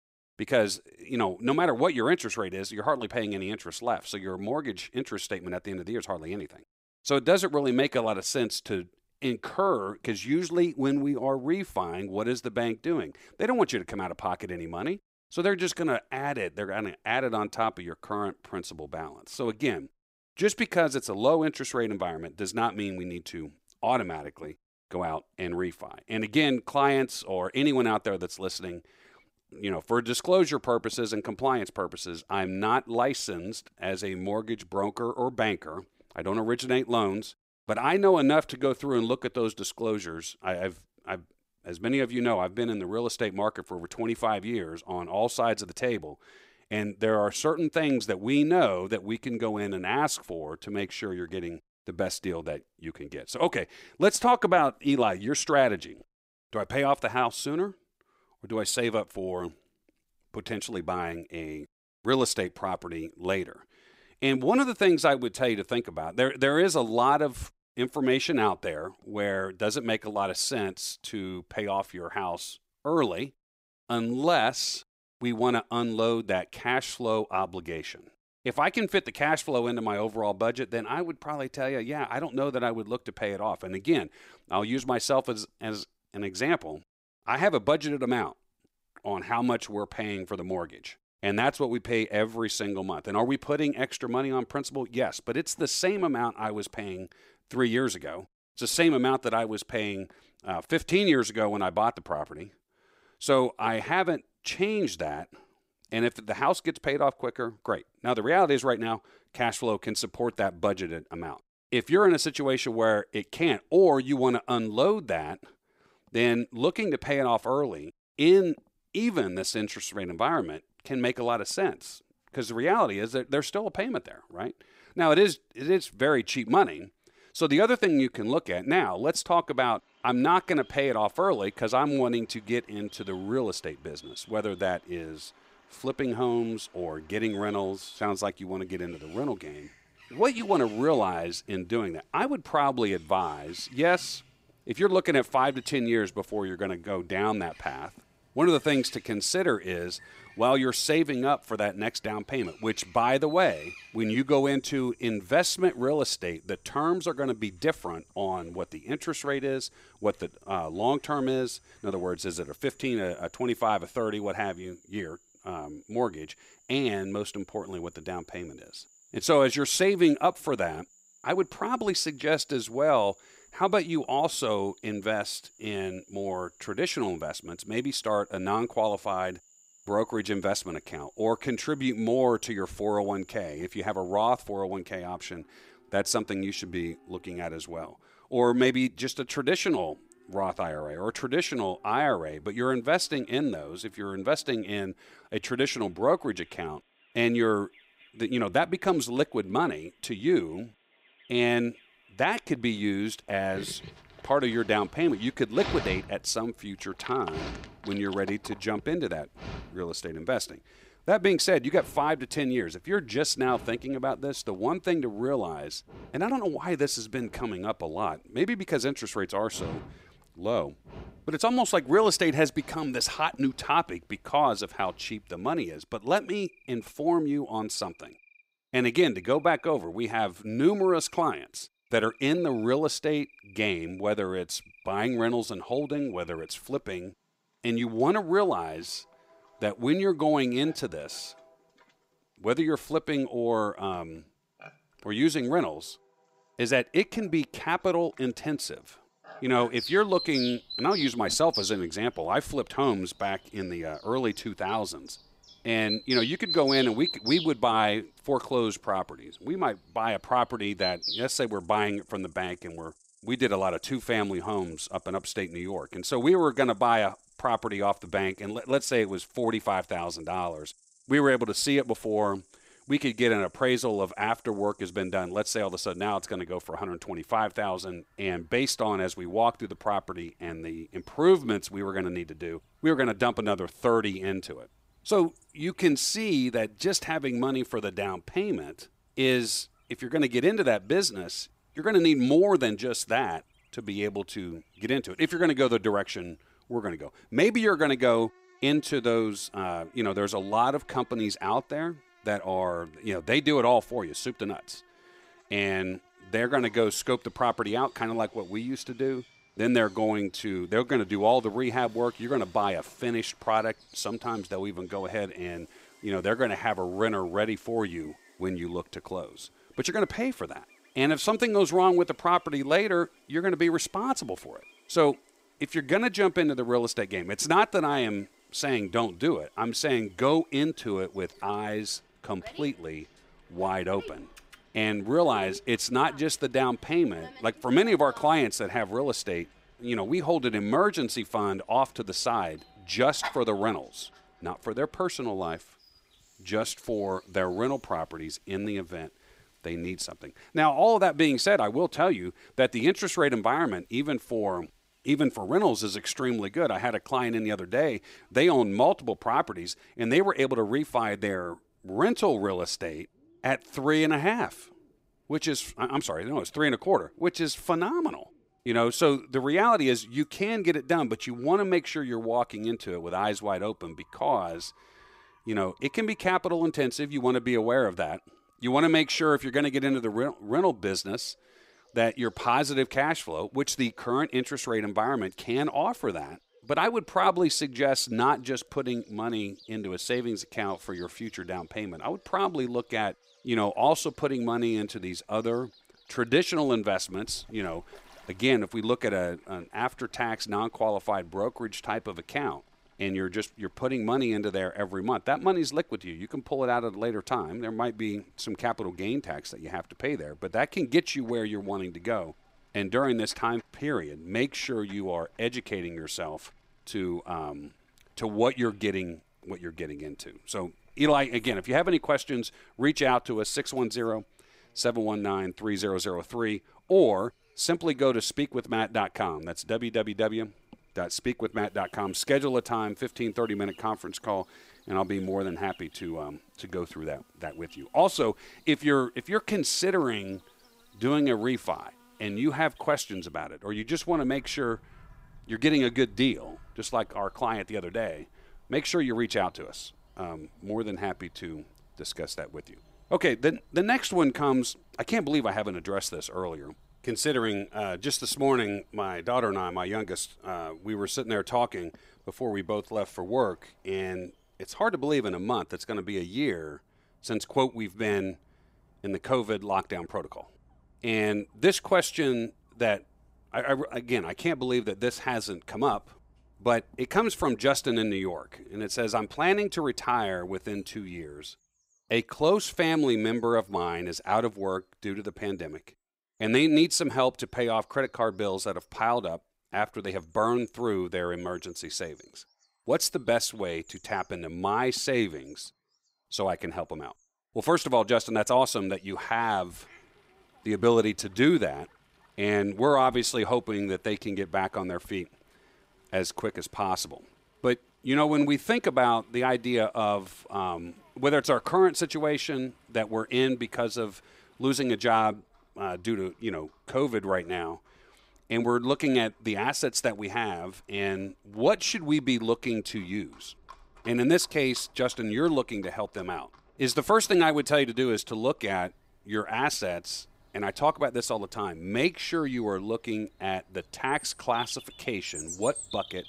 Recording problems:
animal sounds; noticeable; from 2:10 on; 20 dB below the speech

